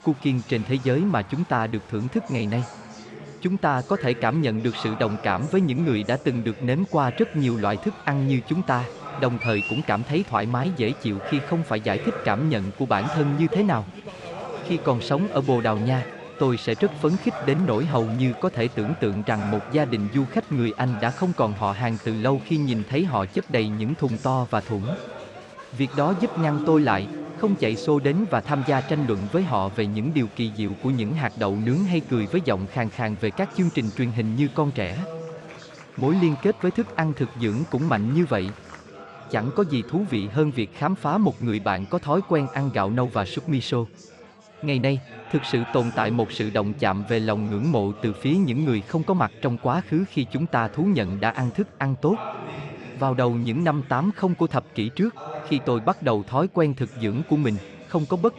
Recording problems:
chatter from many people; noticeable; throughout; 15 dB below the speech

